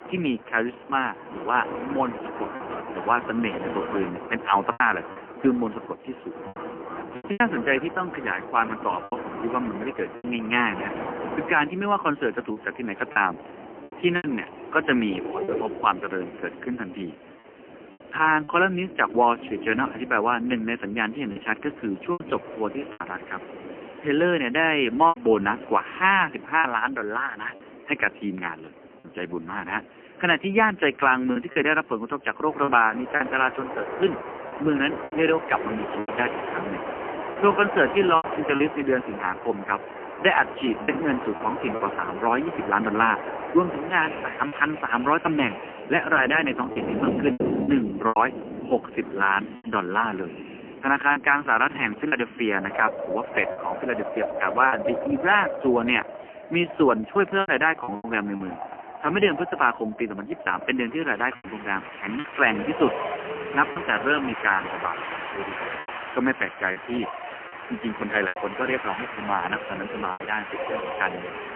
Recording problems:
phone-call audio; poor line; nothing above 3 kHz
wind in the background; loud; throughout; 10 dB below the speech
choppy; occasionally; 4% of the speech affected

